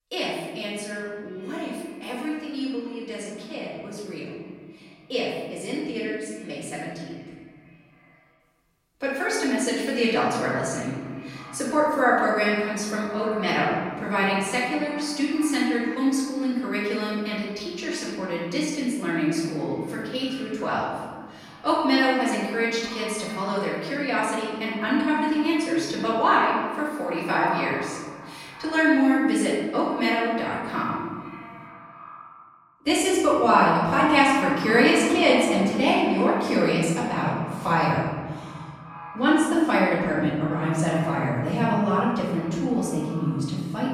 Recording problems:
off-mic speech; far
room echo; noticeable; dies away in 1.7 s
echo of what is said; faint; throughout; 380 ms later, 20 dB below the speech

